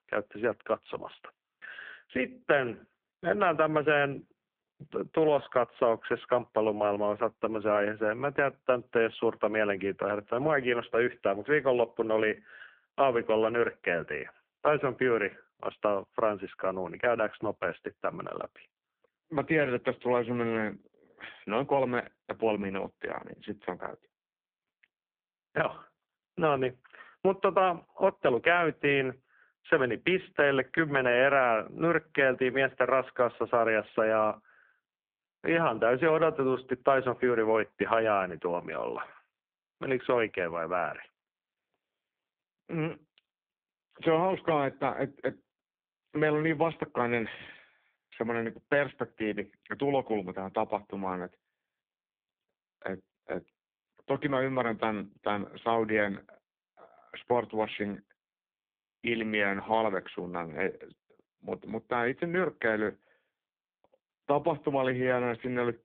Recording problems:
phone-call audio; poor line

